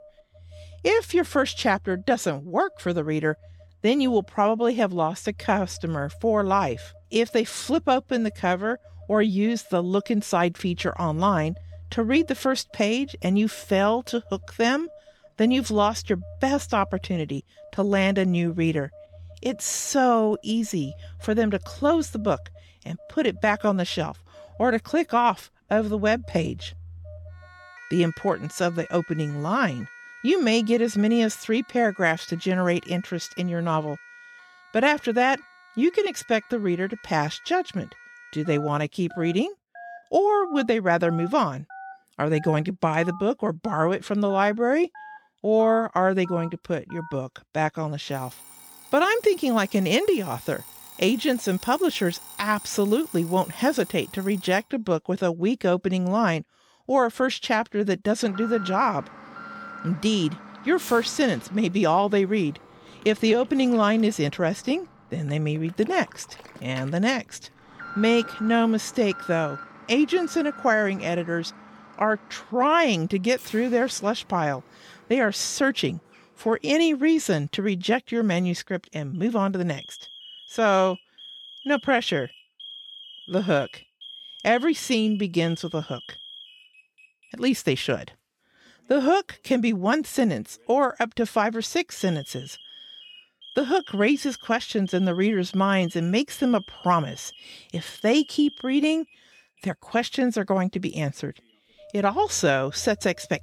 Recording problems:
alarms or sirens; noticeable; throughout; 20 dB below the speech

